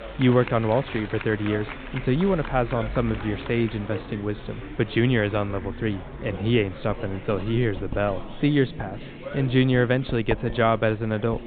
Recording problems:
high frequencies cut off; severe; nothing above 4 kHz
household noises; noticeable; throughout; 20 dB below the speech
murmuring crowd; noticeable; throughout; 15 dB below the speech

